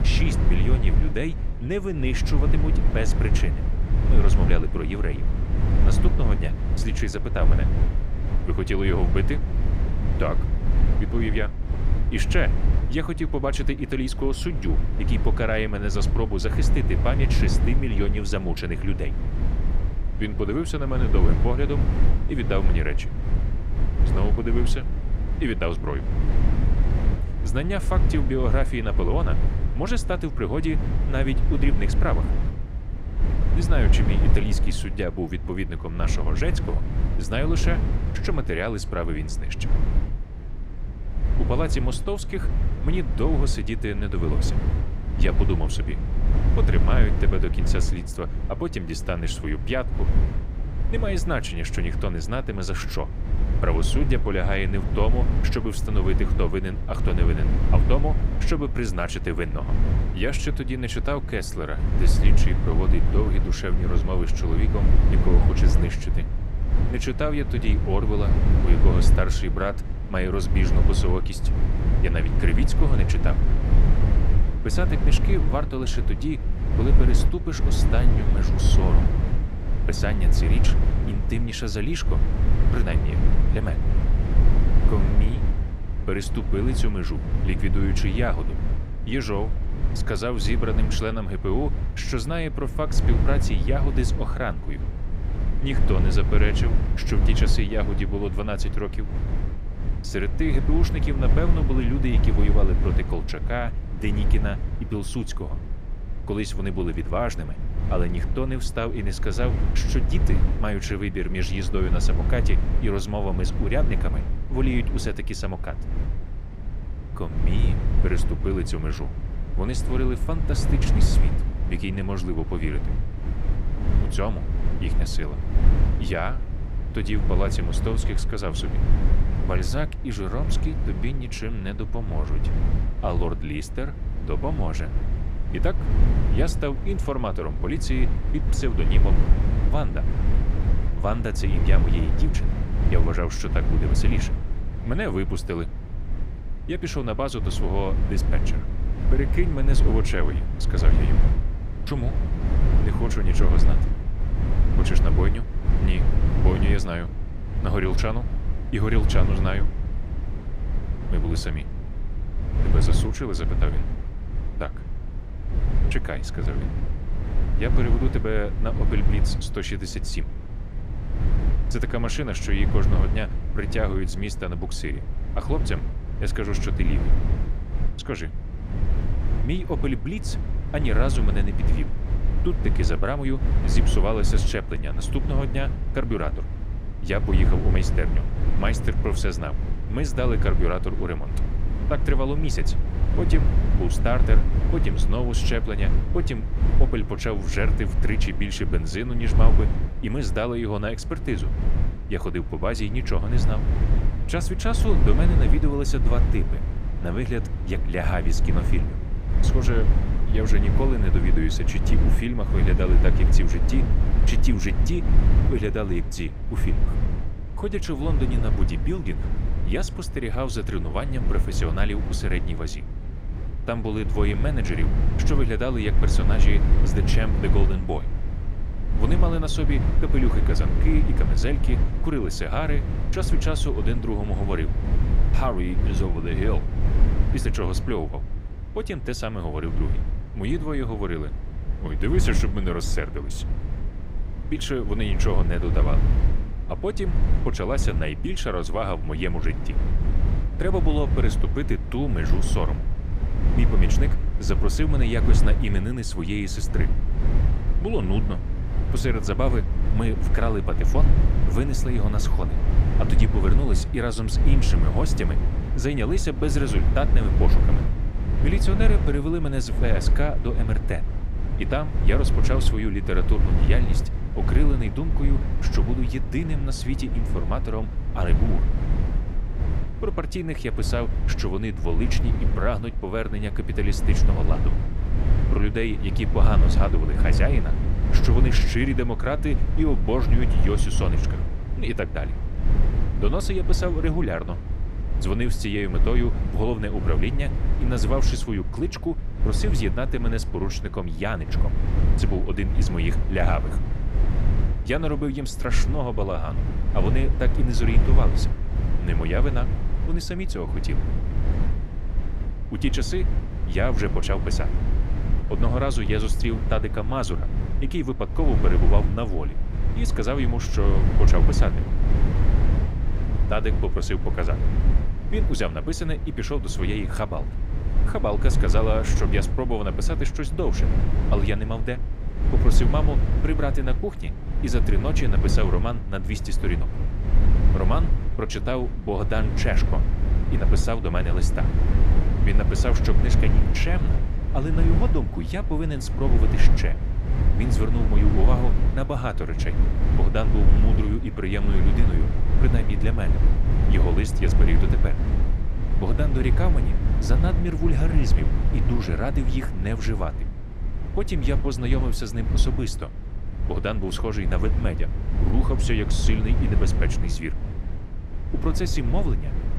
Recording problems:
low rumble; loud; throughout; 7 dB below the speech

